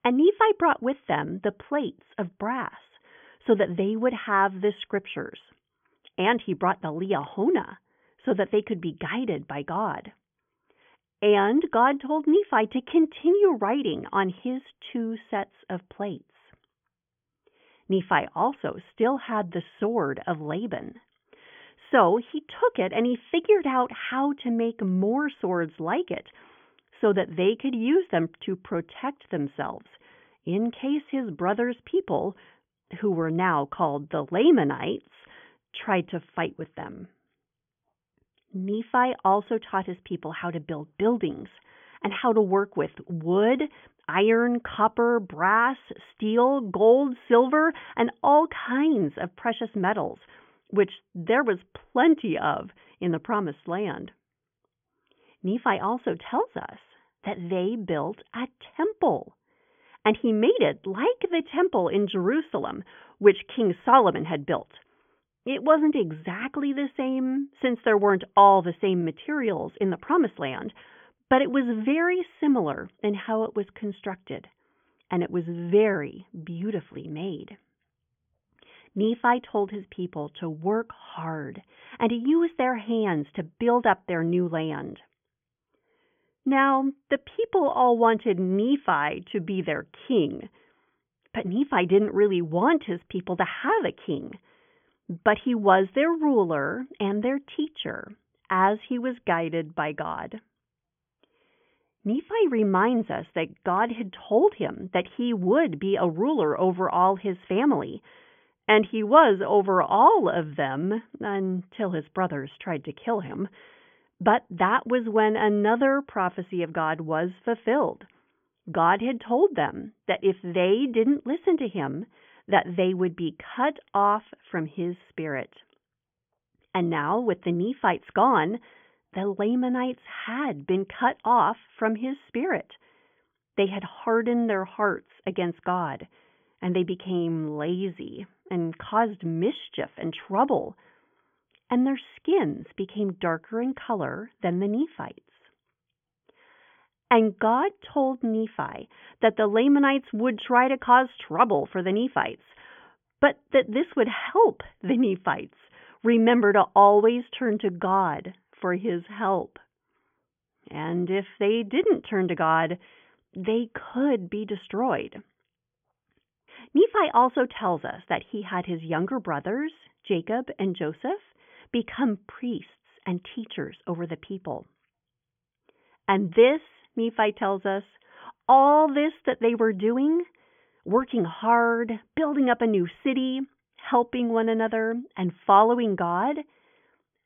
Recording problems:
high frequencies cut off; severe; nothing above 3.5 kHz

